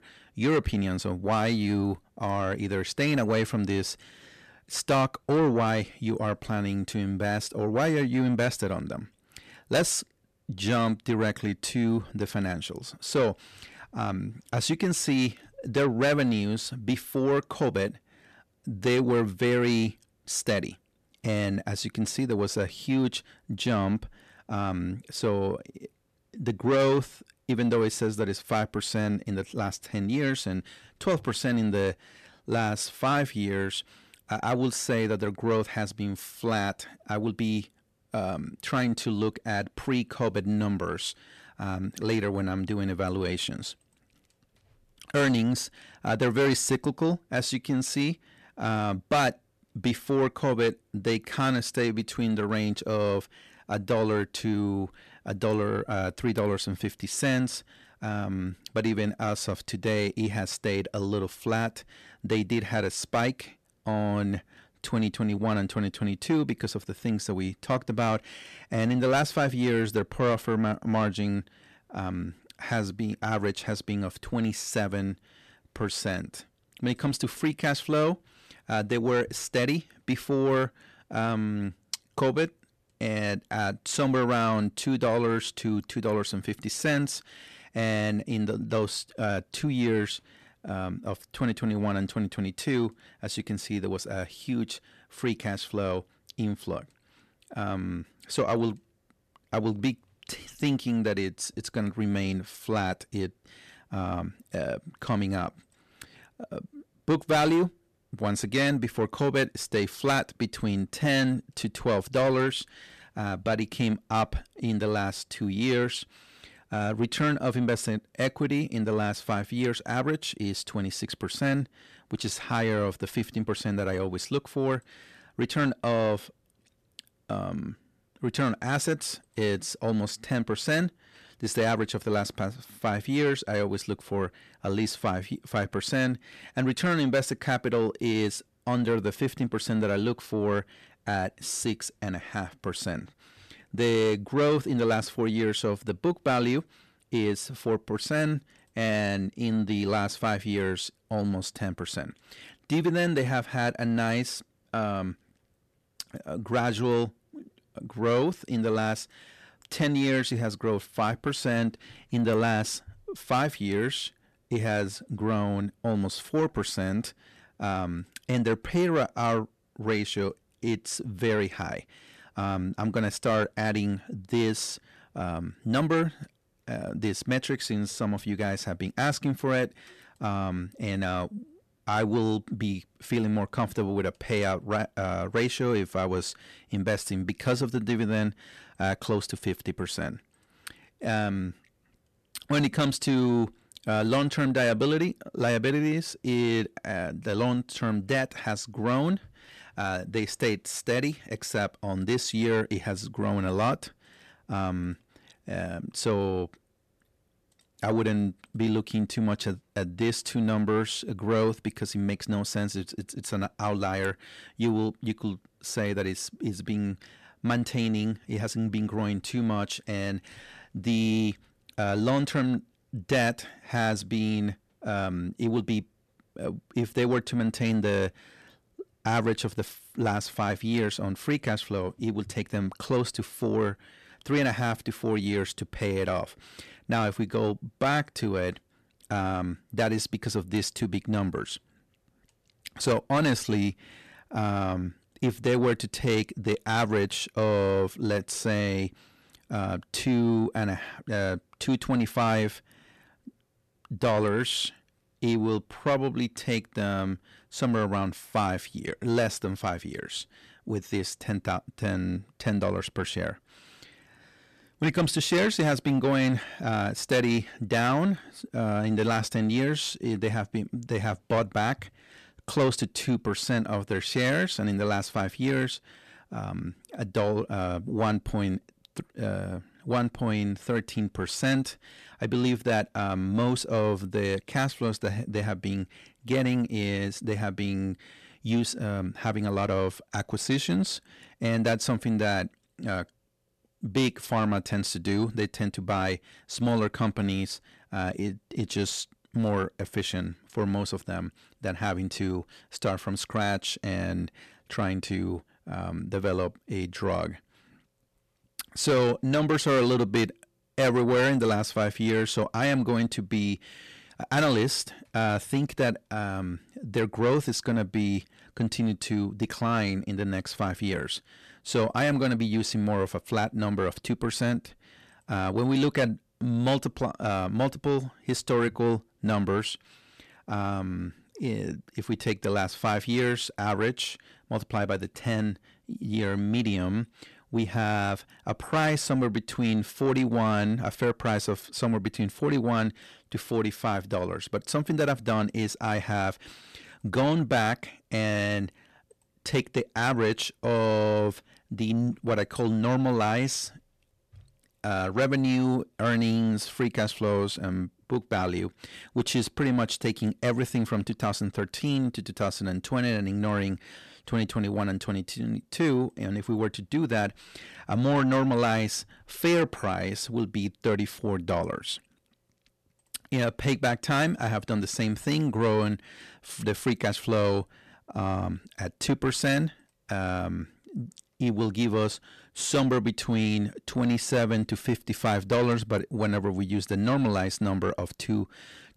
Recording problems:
distortion; slight; 10 dB below the speech

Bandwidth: 14 kHz